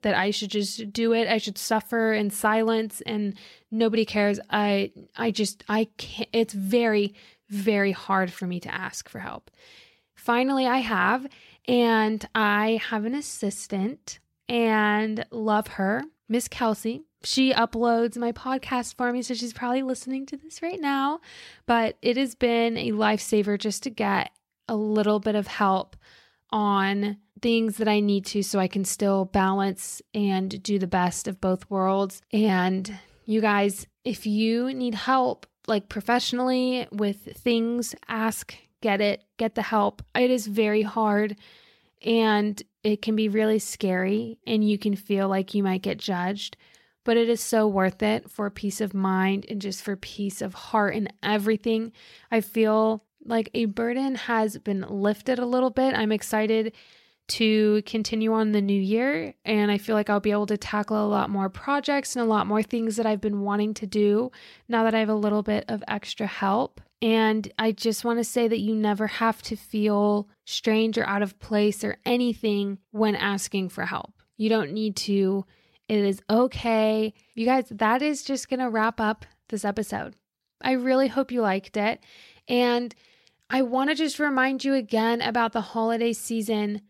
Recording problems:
none

